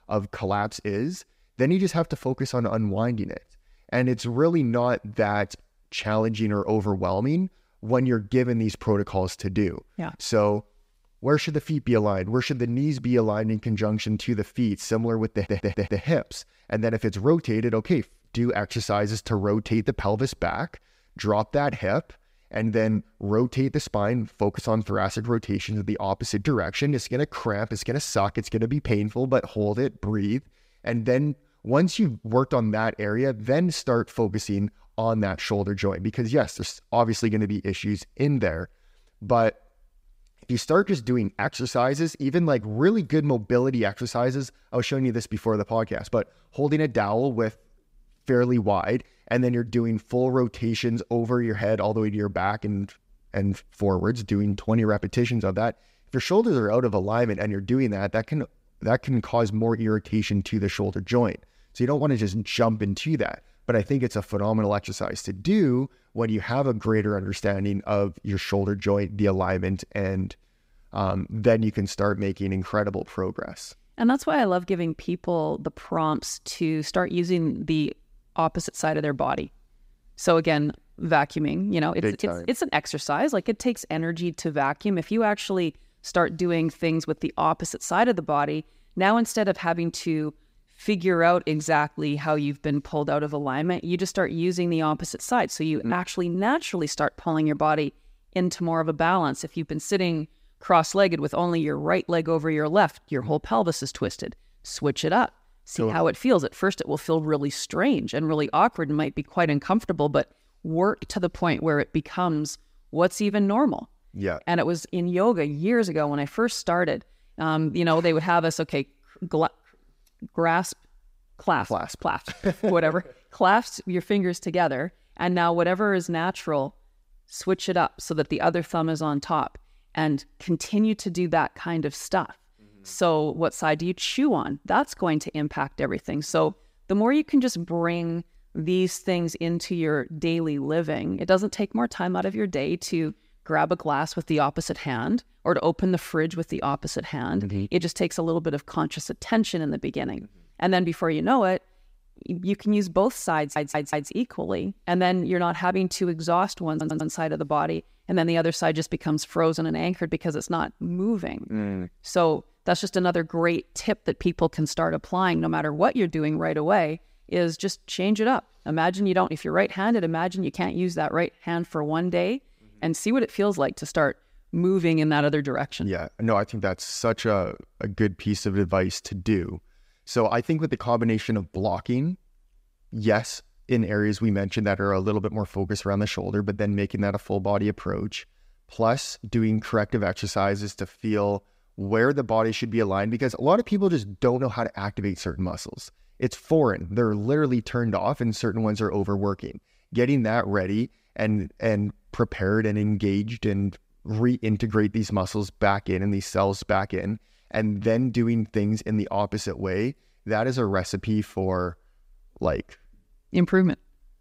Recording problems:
audio stuttering; at 15 s, at 2:33 and at 2:37

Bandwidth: 15.5 kHz